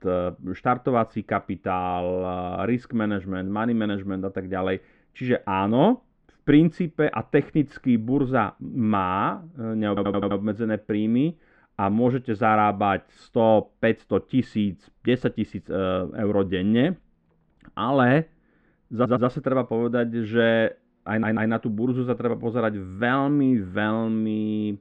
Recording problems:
muffled; very; fading above 2 kHz
audio stuttering; at 10 s, at 19 s and at 21 s

